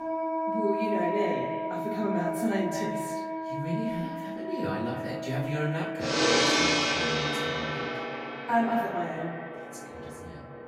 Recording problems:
echo of what is said; strong; throughout; 200 ms later, 9 dB below the speech
off-mic speech; far
room echo; noticeable; dies away in 0.5 s
background music; very loud; throughout; 3 dB above the speech

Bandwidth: 16 kHz